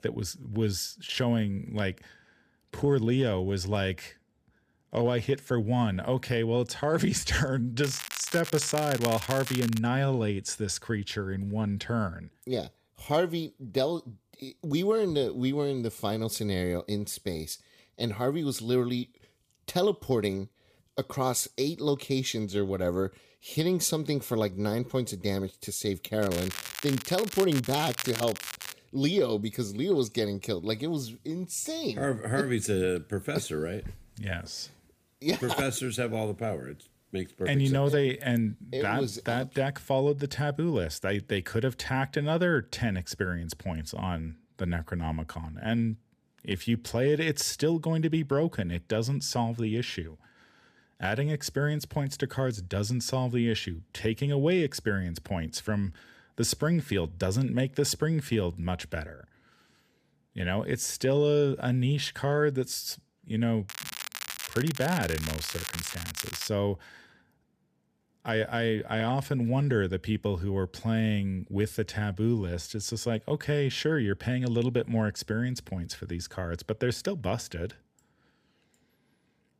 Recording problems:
crackling; loud; from 8 to 10 s, from 26 to 29 s and from 1:04 to 1:06; 7 dB below the speech

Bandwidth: 15 kHz